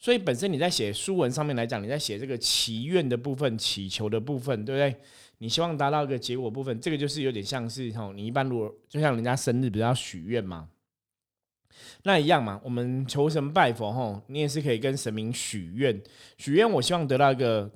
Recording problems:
none

